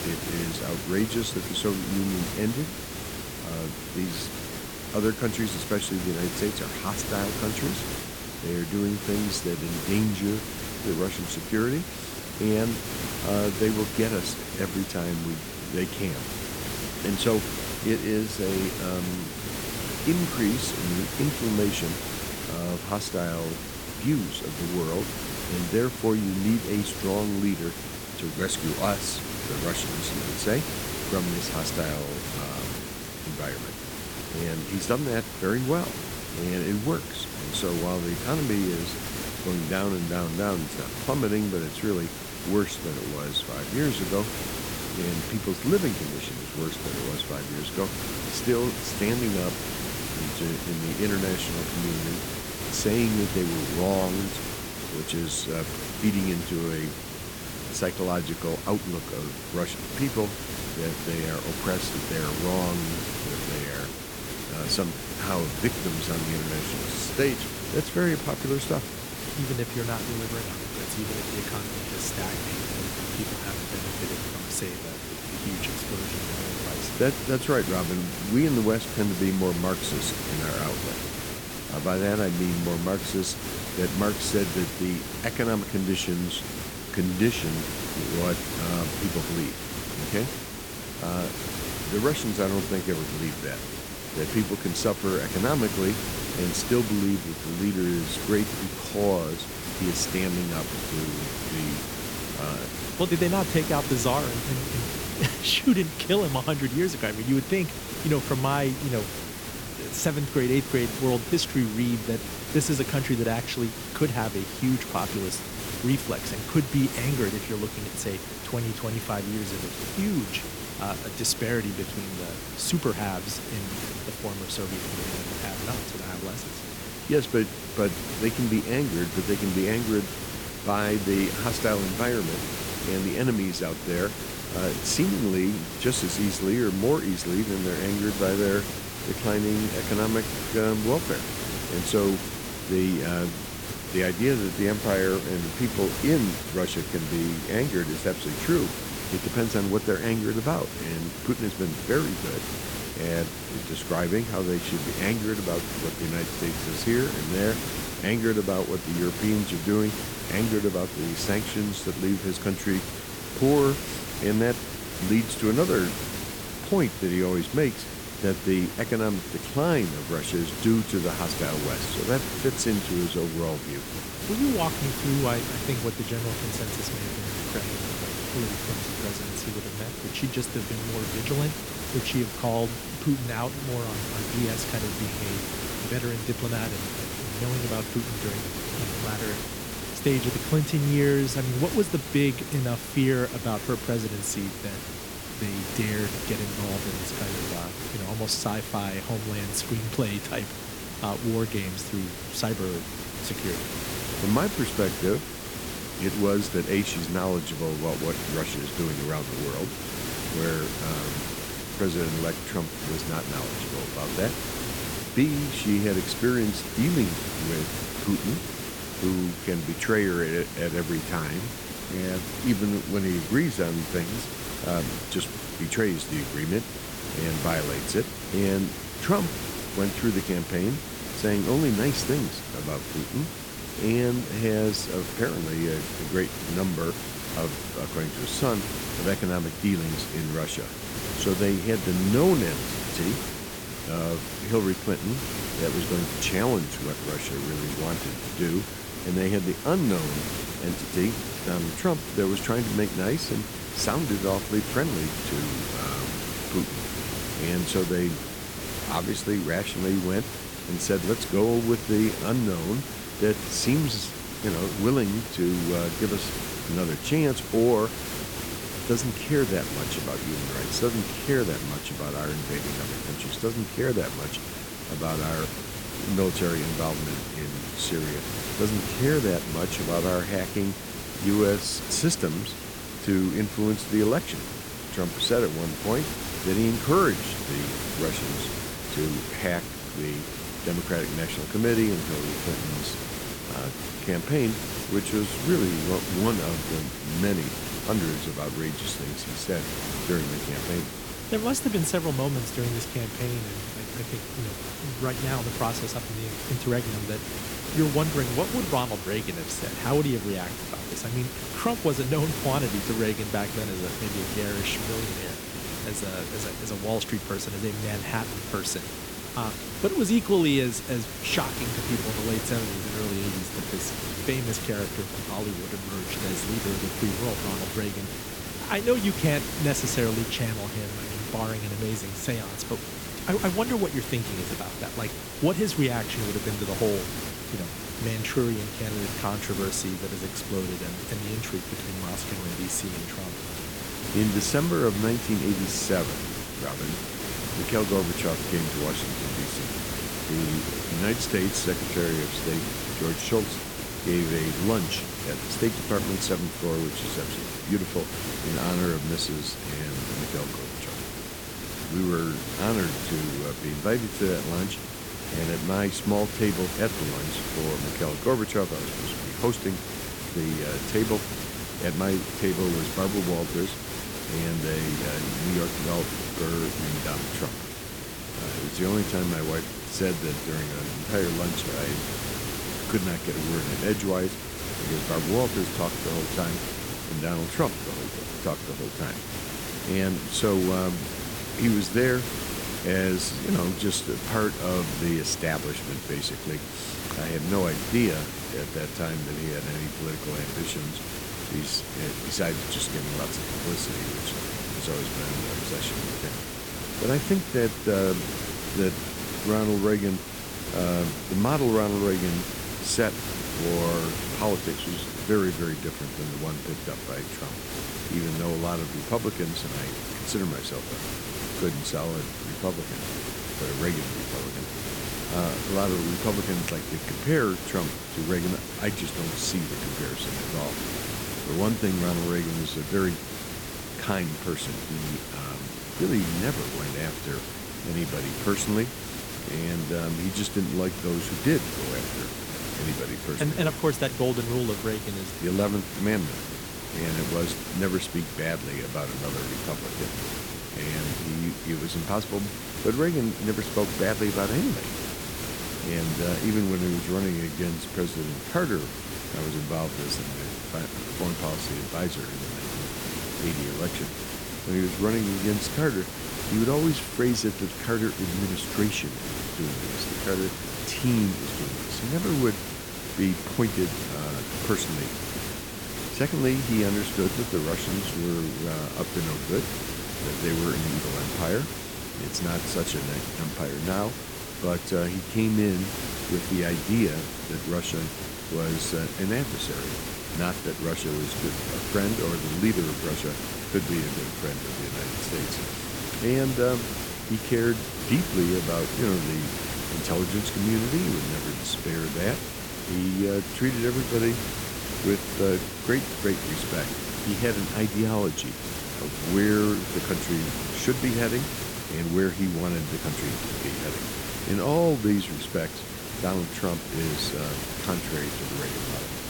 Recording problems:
hiss; loud; throughout; 4 dB below the speech

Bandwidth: 18 kHz